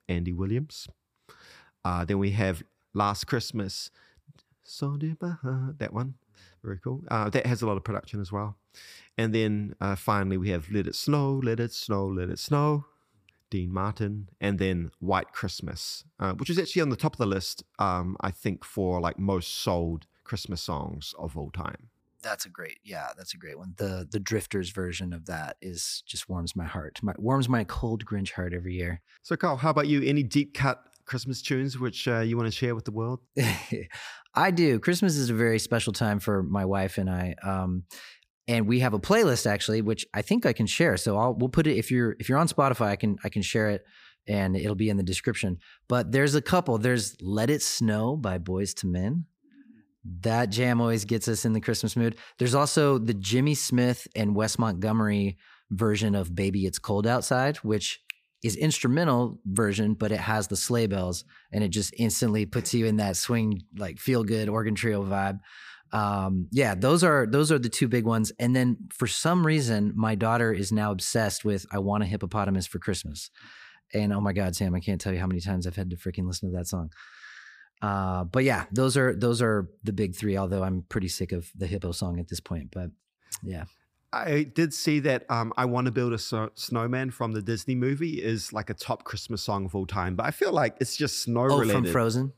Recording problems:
none

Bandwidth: 15 kHz